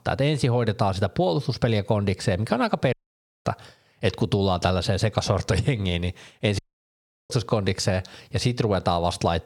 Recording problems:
squashed, flat; somewhat
audio cutting out; at 3 s for 0.5 s and at 6.5 s for 0.5 s

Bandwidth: 17 kHz